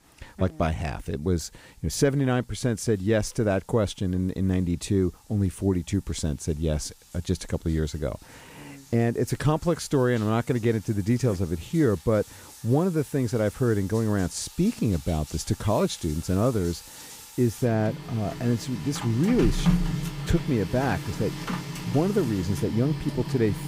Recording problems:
household noises; loud; throughout; 9 dB below the speech

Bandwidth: 15.5 kHz